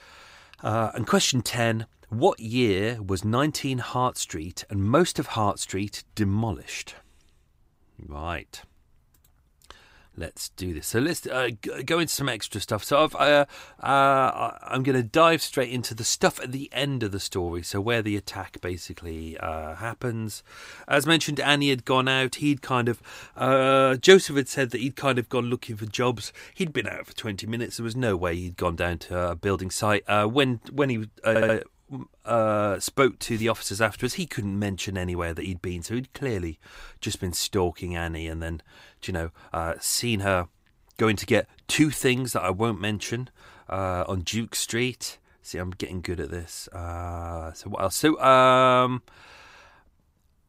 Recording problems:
audio stuttering; at 31 s

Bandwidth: 15.5 kHz